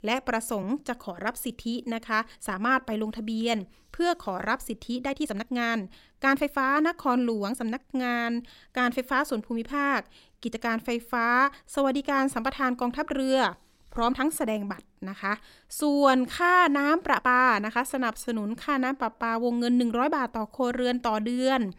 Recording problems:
uneven, jittery; strongly; from 0.5 to 21 s

